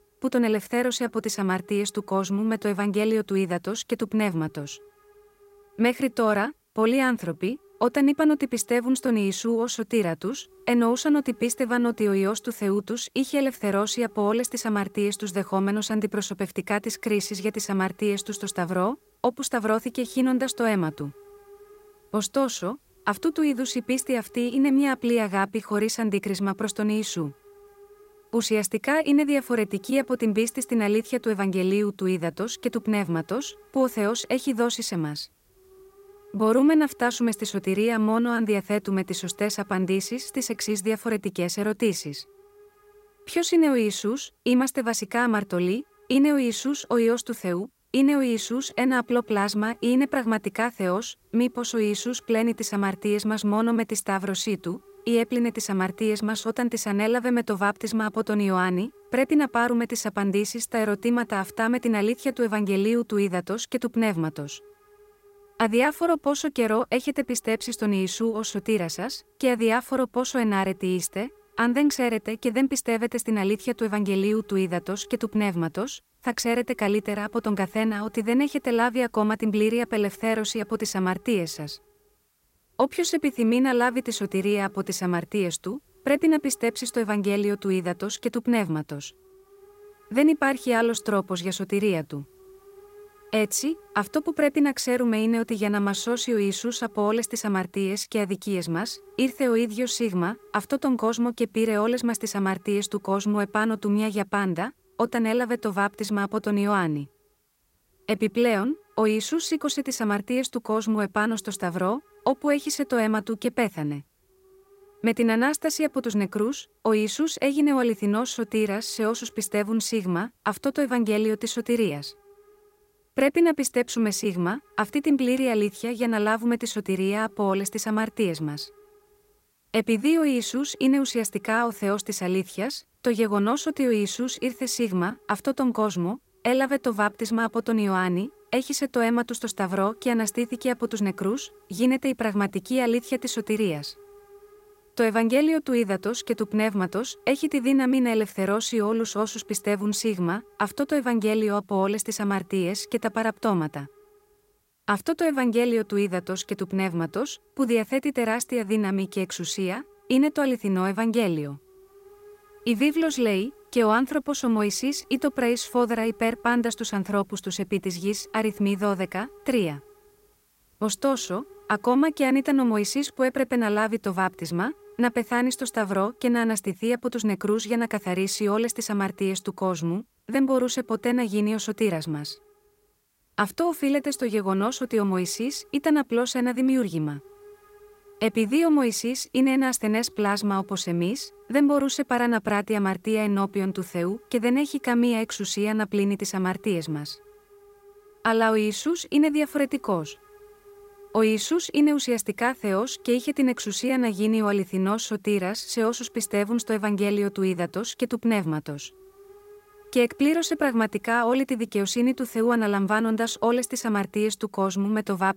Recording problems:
hiss; faint; throughout; 30 dB below the speech

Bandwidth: 16 kHz